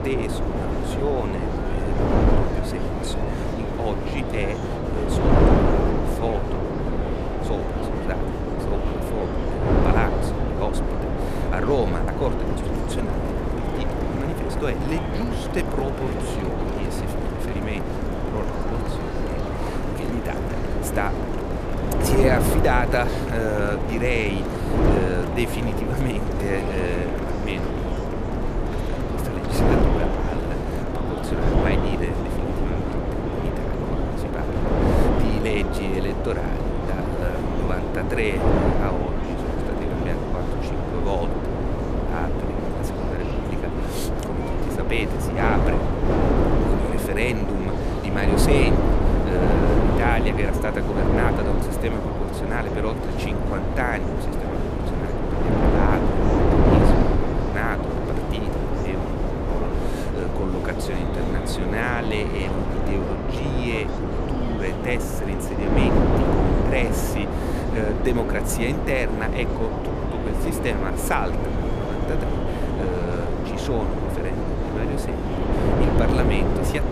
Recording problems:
wind noise on the microphone; heavy; 2 dB above the speech
murmuring crowd; loud; throughout; 9 dB below the speech

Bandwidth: 14 kHz